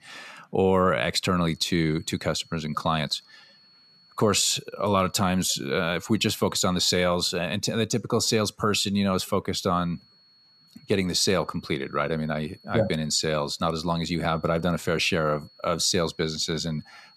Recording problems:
high-pitched whine; faint; from 1.5 to 7 s and from 9.5 s on; 4.5 kHz, 30 dB below the speech

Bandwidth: 14.5 kHz